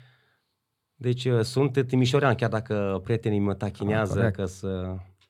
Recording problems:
none

